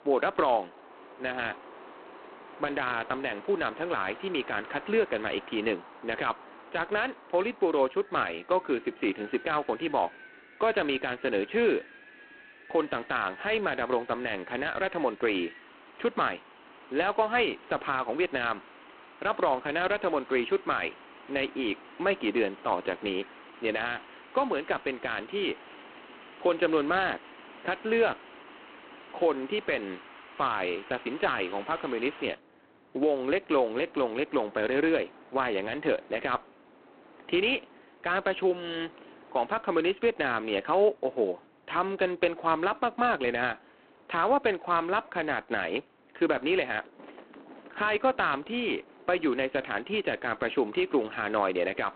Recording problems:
phone-call audio; poor line
wind in the background; faint; throughout; 20 dB below the speech

